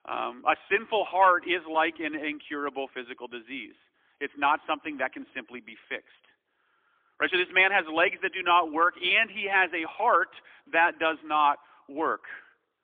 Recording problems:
phone-call audio; poor line; nothing above 3.5 kHz

